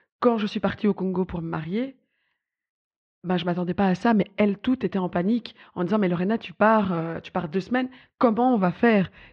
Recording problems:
muffled; very; fading above 3 kHz

